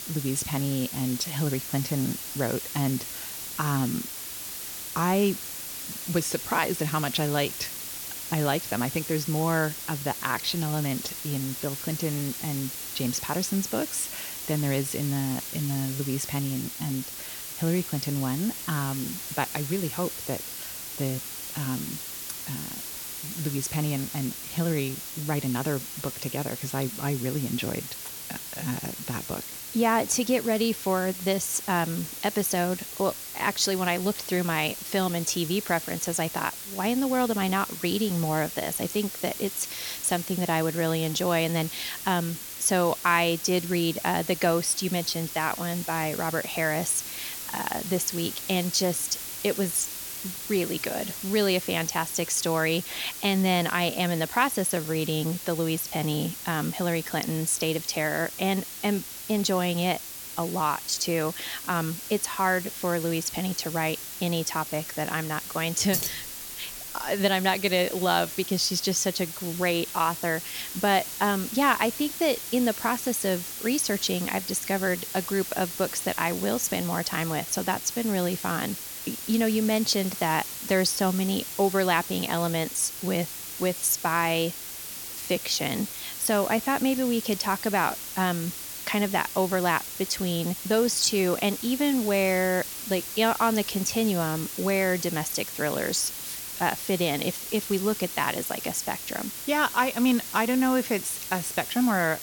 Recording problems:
hiss; loud; throughout; 7 dB below the speech
jangling keys; noticeable; at 1:06; peak 1 dB below the speech

